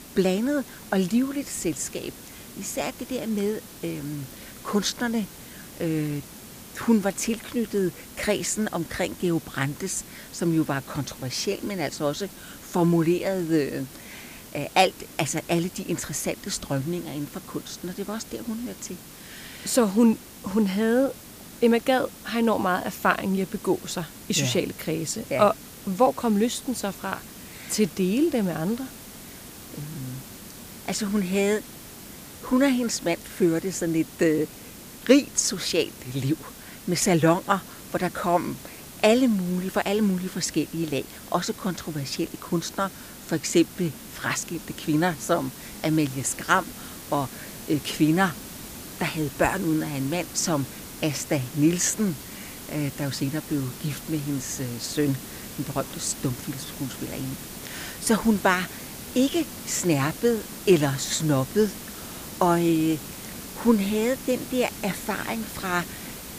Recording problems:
hiss; noticeable; throughout; 15 dB below the speech

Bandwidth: 15 kHz